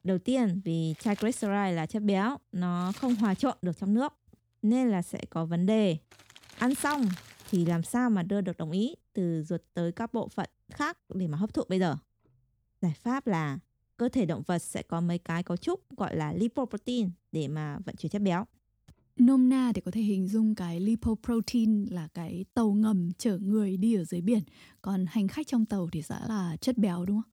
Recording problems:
household noises; noticeable; throughout; 20 dB below the speech

